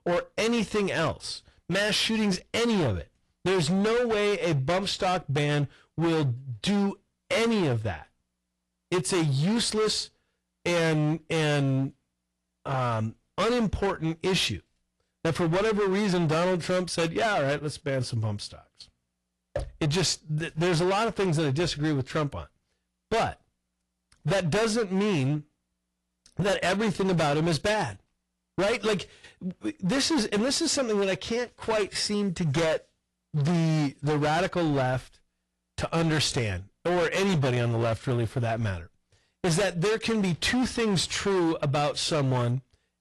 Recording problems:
distortion; heavy; 21% of the sound clipped
garbled, watery; slightly

